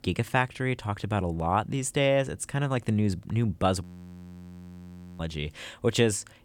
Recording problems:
audio freezing; at 4 s for 1.5 s

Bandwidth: 18 kHz